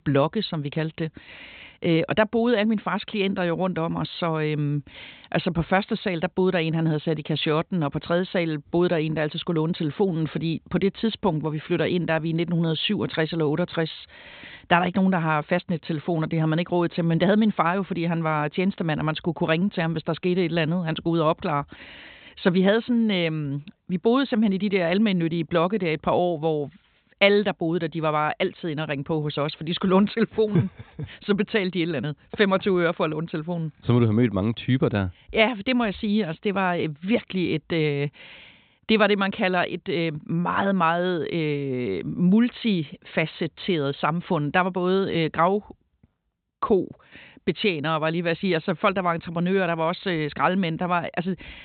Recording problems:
high frequencies cut off; severe; nothing above 4 kHz

